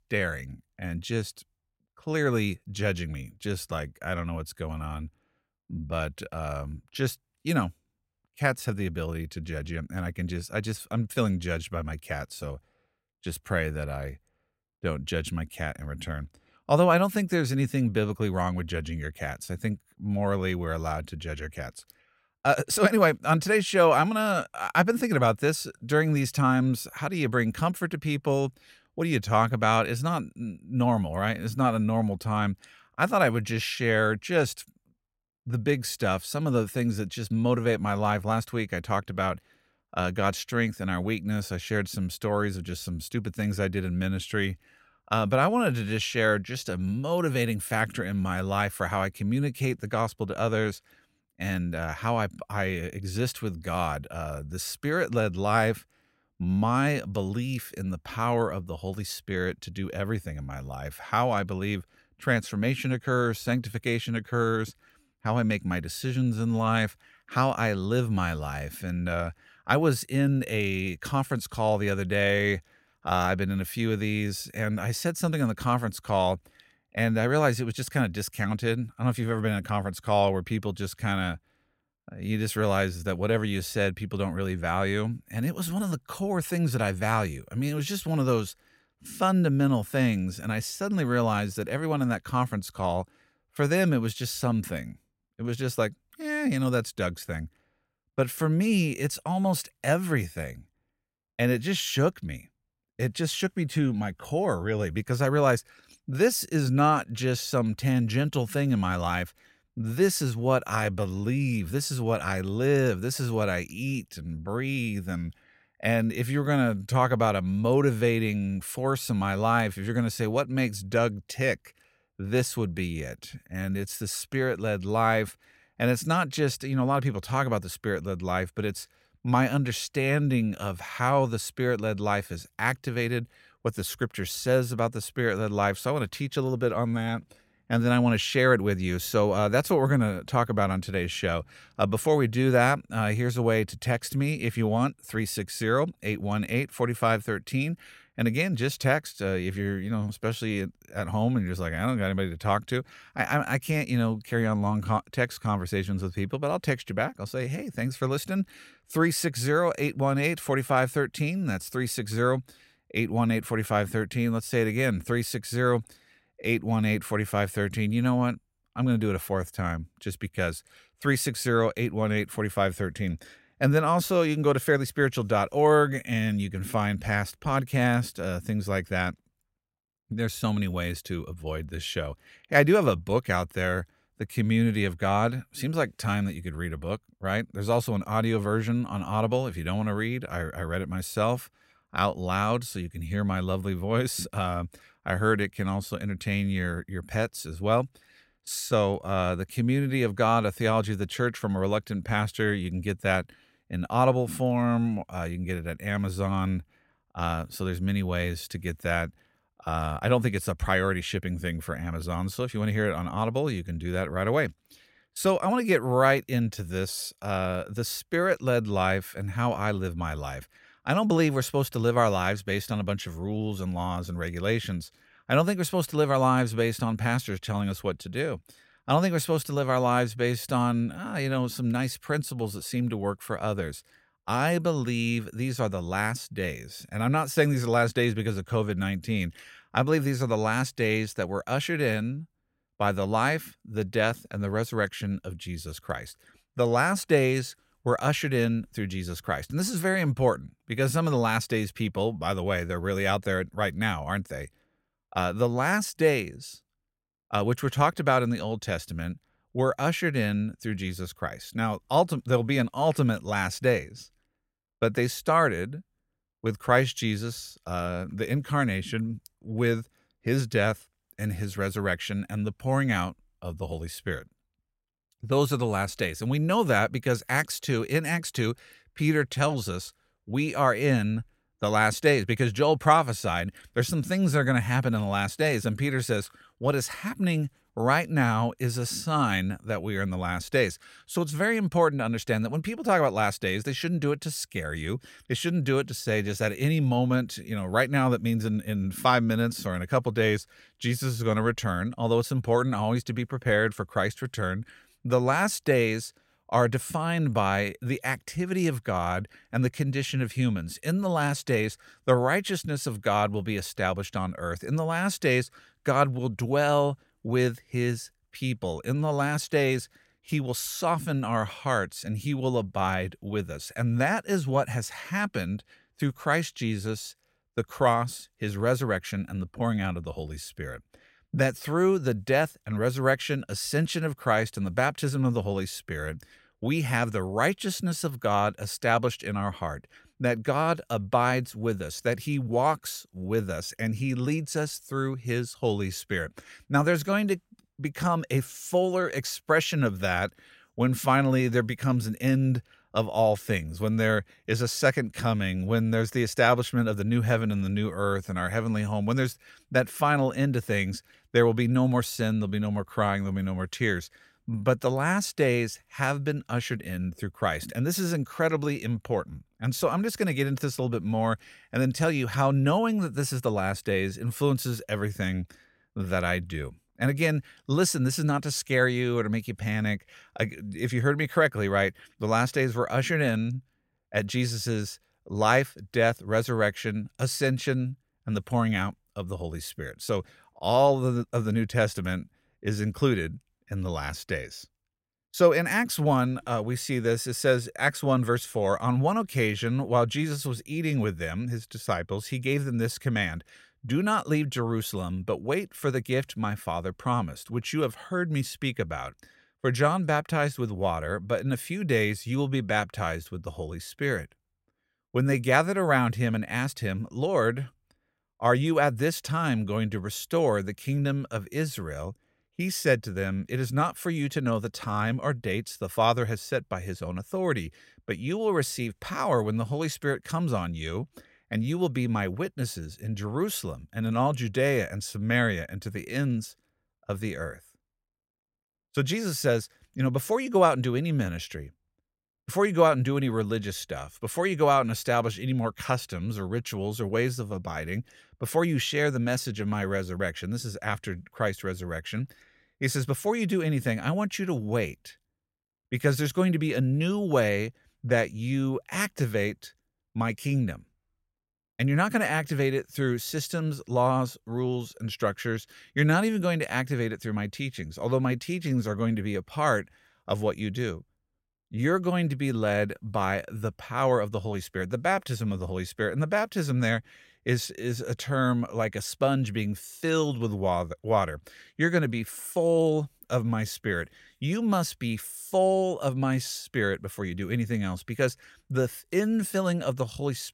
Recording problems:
none

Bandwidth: 16 kHz